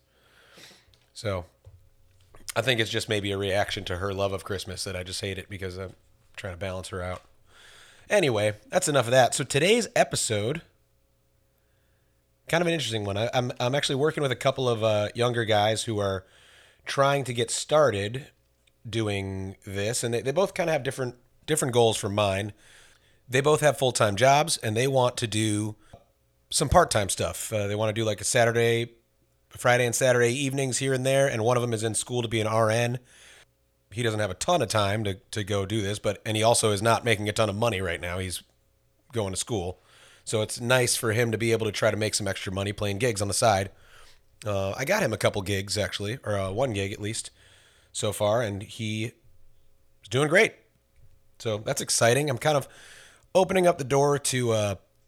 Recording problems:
none

